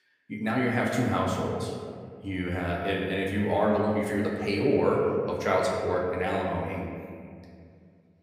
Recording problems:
room echo; noticeable; dies away in 2.1 s
off-mic speech; somewhat distant

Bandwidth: 15.5 kHz